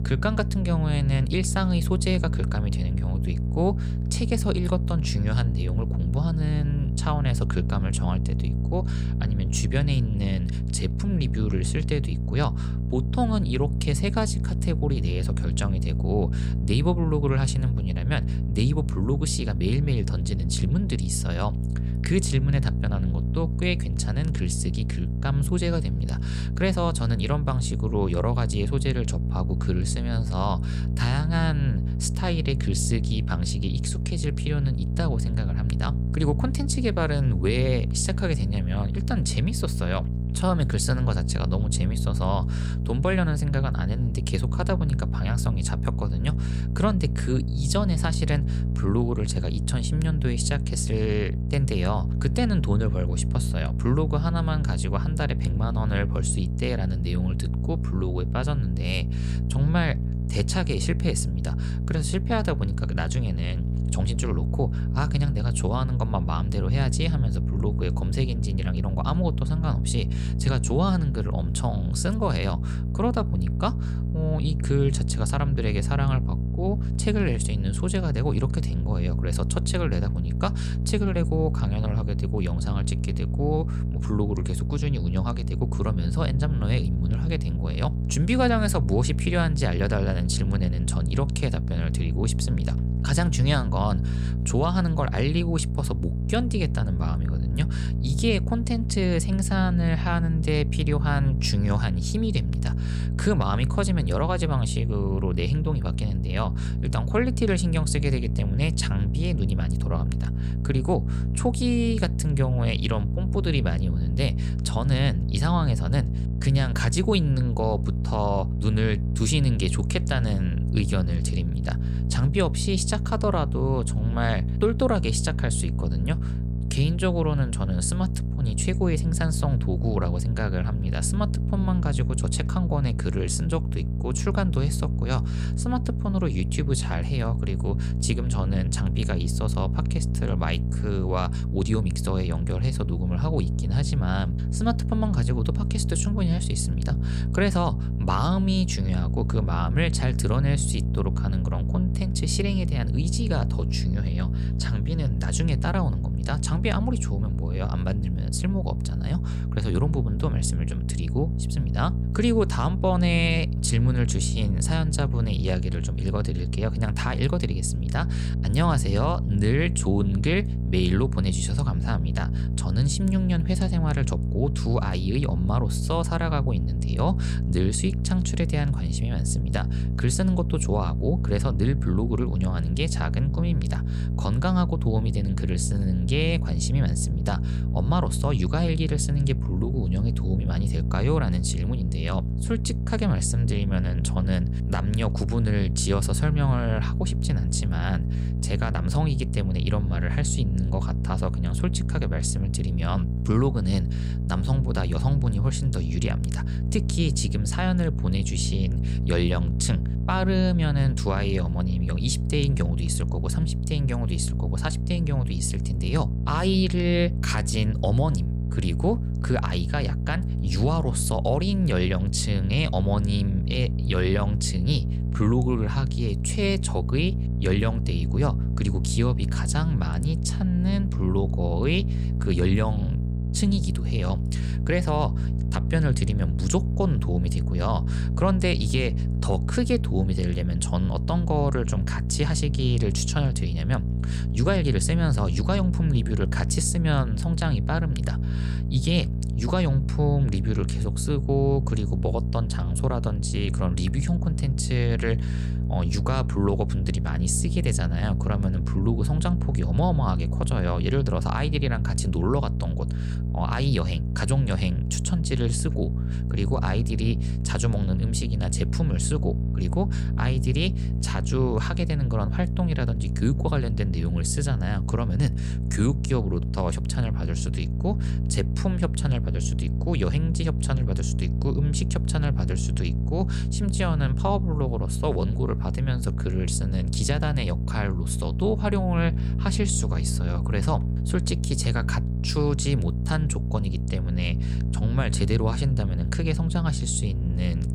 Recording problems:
electrical hum; loud; throughout; 60 Hz, 8 dB below the speech

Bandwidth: 18 kHz